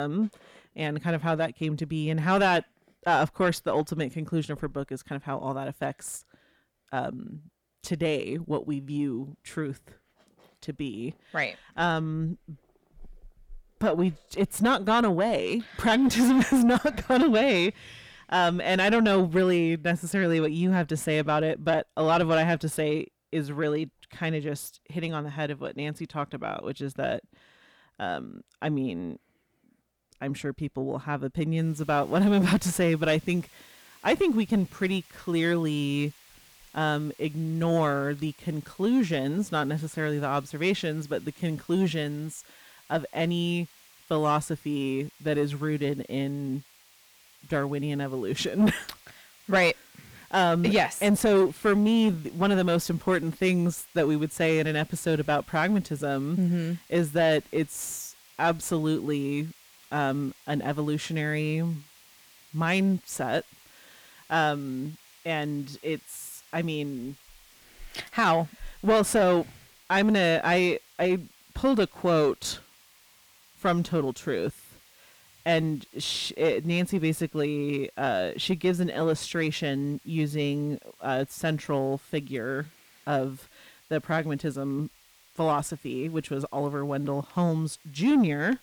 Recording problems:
distortion; slight; 10 dB below the speech
hiss; faint; from 32 s on; 25 dB below the speech
abrupt cut into speech; at the start

